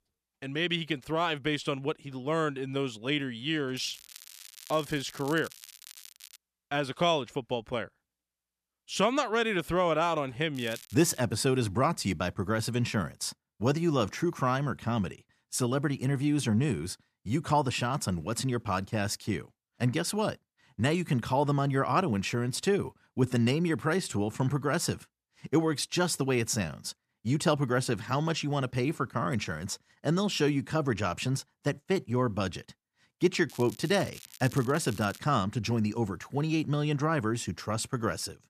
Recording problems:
crackling; noticeable; from 4 to 6.5 s, at 11 s and from 33 to 35 s; 20 dB below the speech

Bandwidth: 14.5 kHz